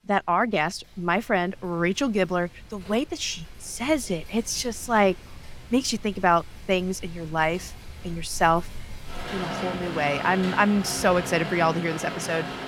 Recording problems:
rain or running water; noticeable; throughout; 10 dB below the speech

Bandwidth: 17 kHz